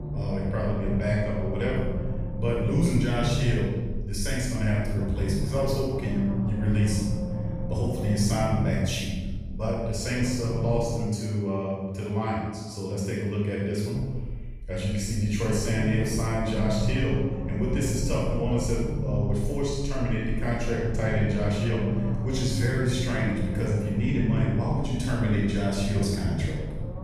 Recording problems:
room echo; strong; dies away in 1.3 s
off-mic speech; far
low rumble; loud; until 11 s and from 14 s on; 9 dB below the speech

